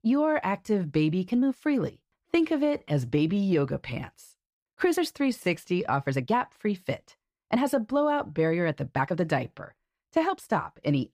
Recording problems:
uneven, jittery; strongly; from 0.5 to 10 s

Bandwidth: 15 kHz